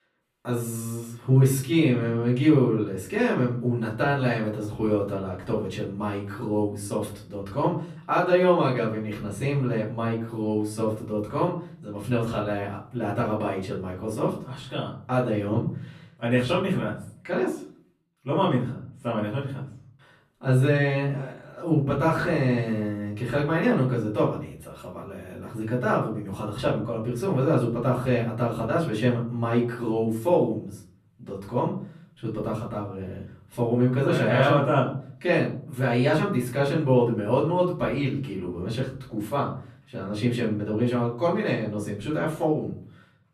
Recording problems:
off-mic speech; far
room echo; slight; dies away in 0.5 s

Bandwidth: 14 kHz